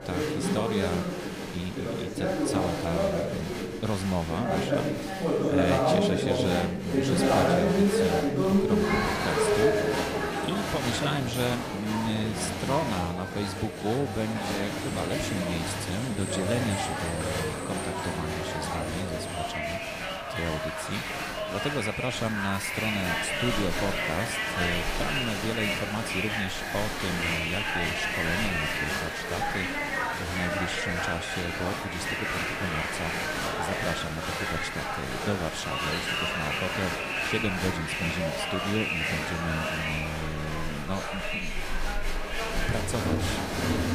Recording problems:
crowd noise; very loud; throughout; 4 dB above the speech
wind noise on the microphone; occasional gusts; 20 dB below the speech

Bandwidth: 15 kHz